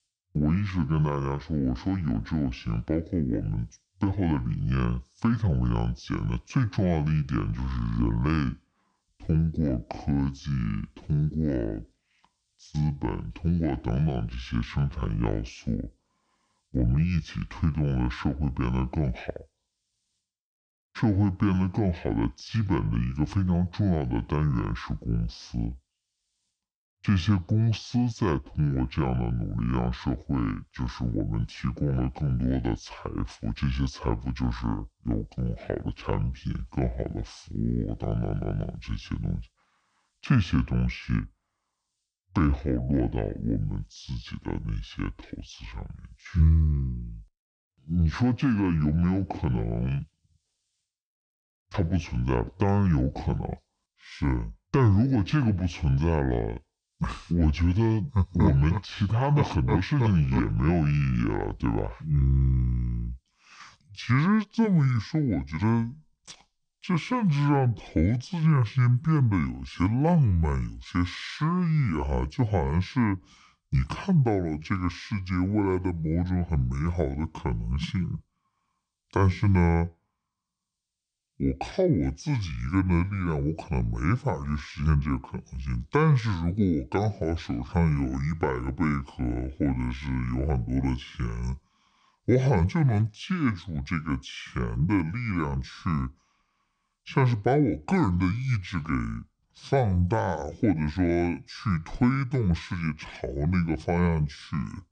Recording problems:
wrong speed and pitch; too slow and too low; 0.6 times normal speed

